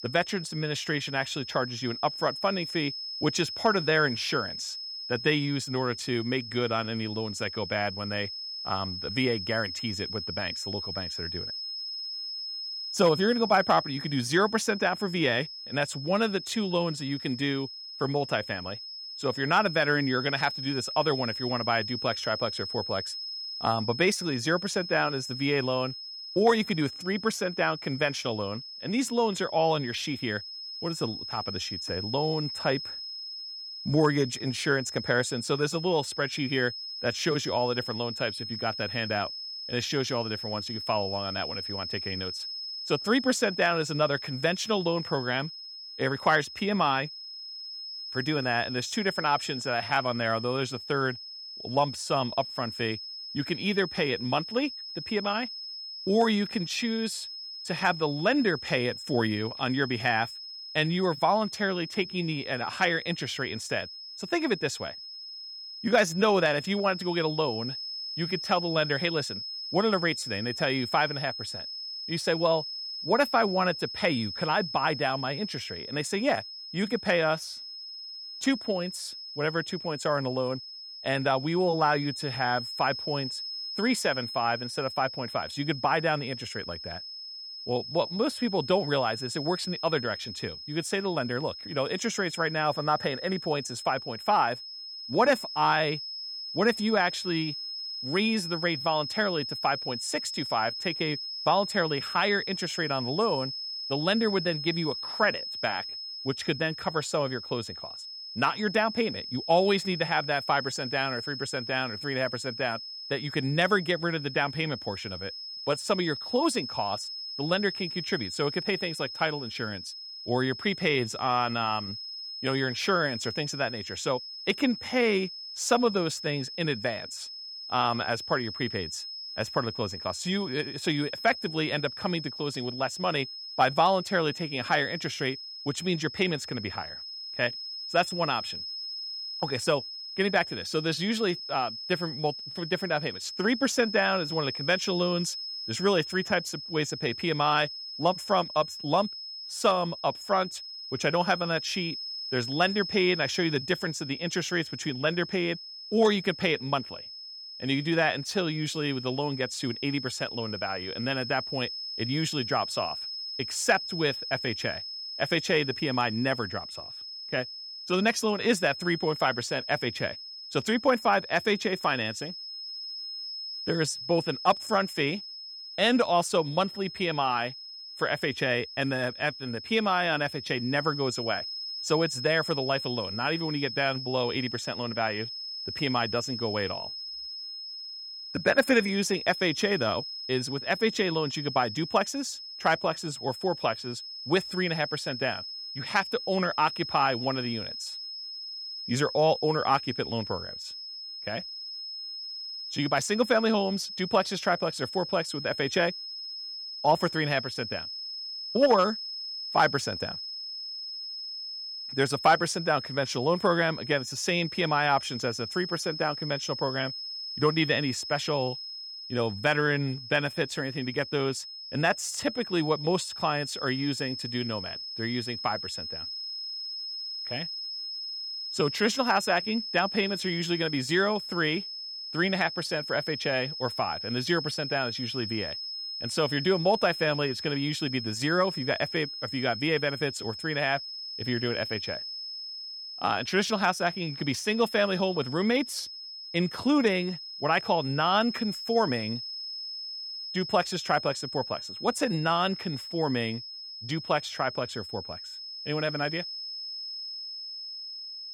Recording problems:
high-pitched whine; loud; throughout; 5 kHz, 7 dB below the speech

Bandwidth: 18 kHz